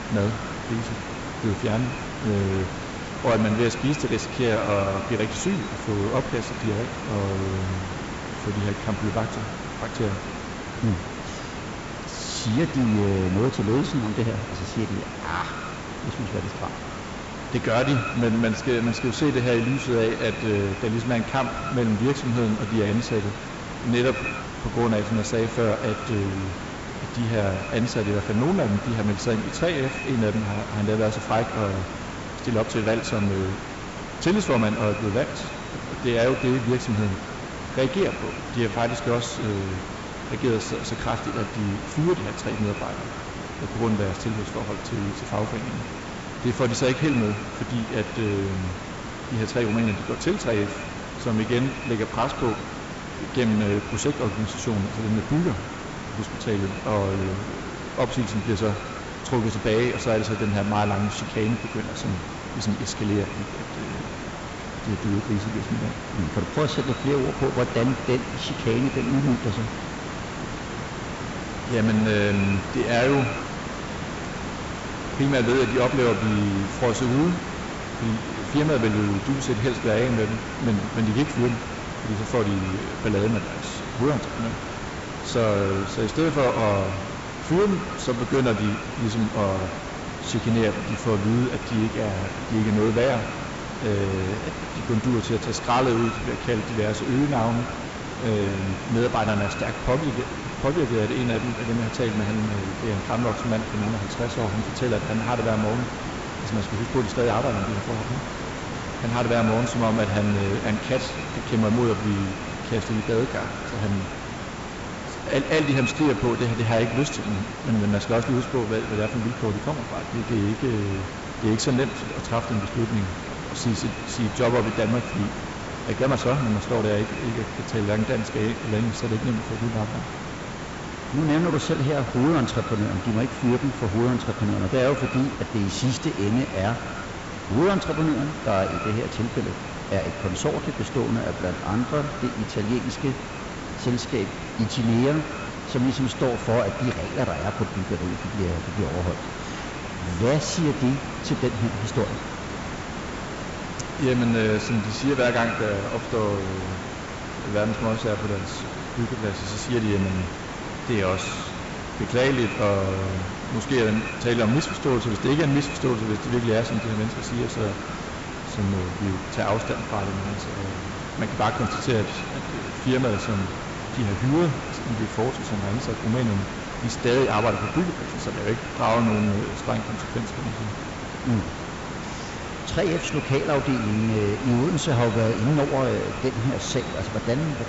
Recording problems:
echo of what is said; noticeable; throughout; 90 ms later, 10 dB below the speech
high frequencies cut off; noticeable; nothing above 8 kHz
distortion; slight; 5% of the sound clipped
hiss; loud; throughout; 7 dB below the speech

